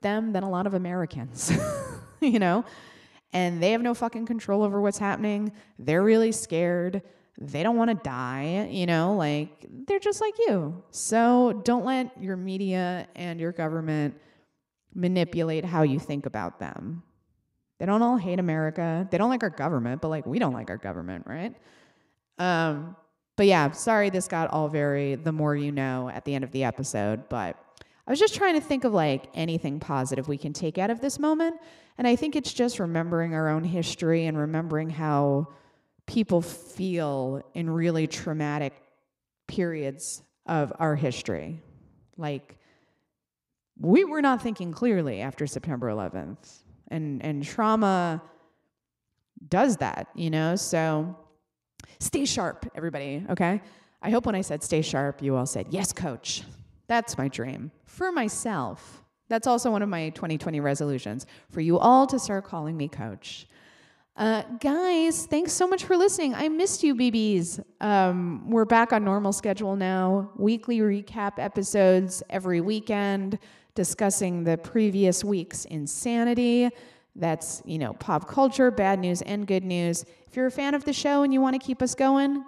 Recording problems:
echo of what is said; faint; throughout; 100 ms later, 25 dB below the speech

